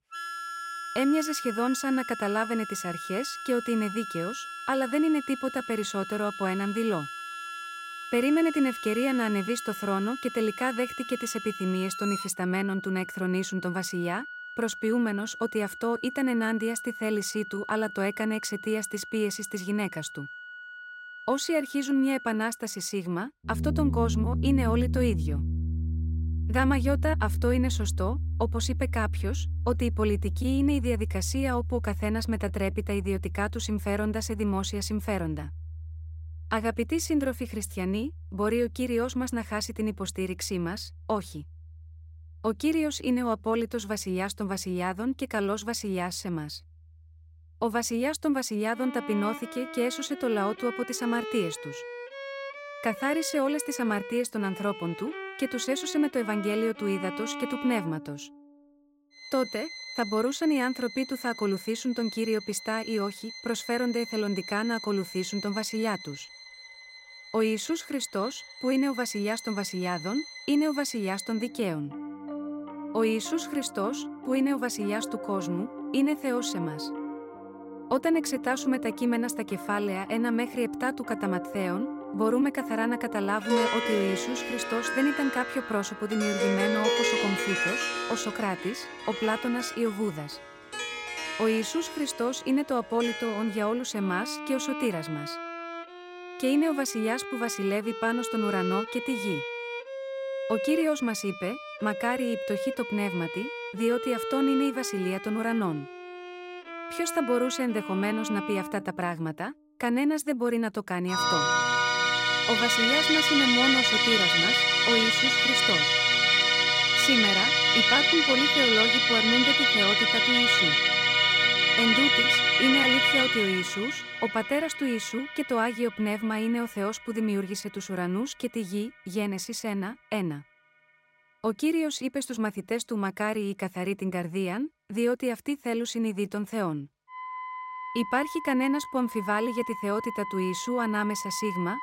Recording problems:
background music; very loud; throughout; 1 dB above the speech

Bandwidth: 16 kHz